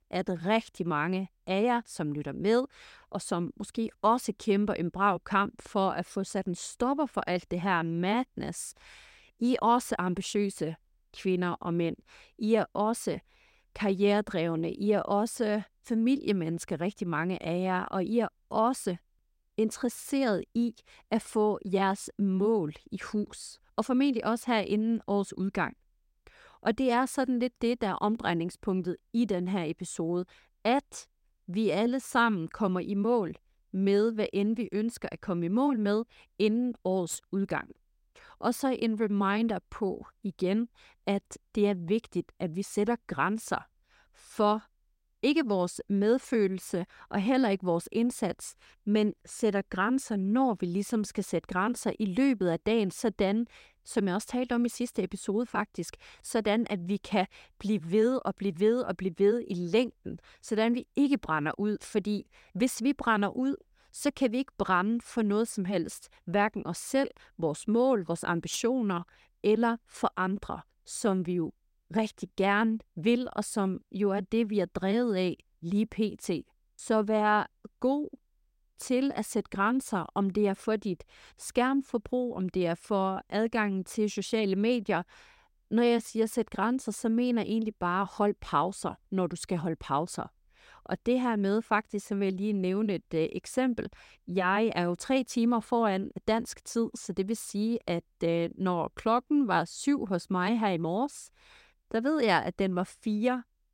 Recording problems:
none

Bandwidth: 16 kHz